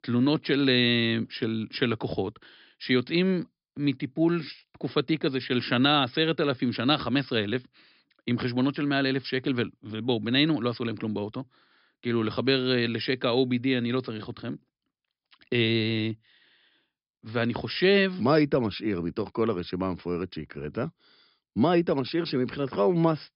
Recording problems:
high frequencies cut off; noticeable; nothing above 5.5 kHz

